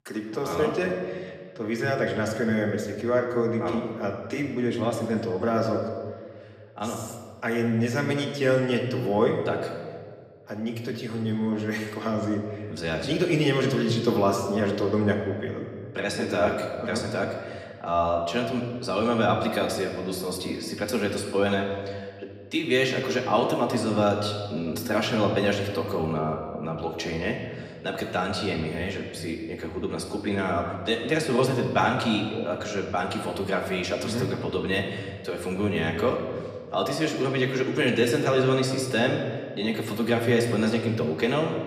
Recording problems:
room echo; slight; dies away in 1.4 s
off-mic speech; somewhat distant

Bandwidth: 14.5 kHz